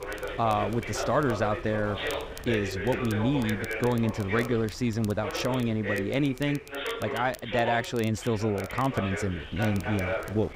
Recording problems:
voice in the background; loud; throughout; 6 dB below the speech
wind noise on the microphone; occasional gusts; 20 dB below the speech
crackle, like an old record; faint; 20 dB below the speech

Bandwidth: 15.5 kHz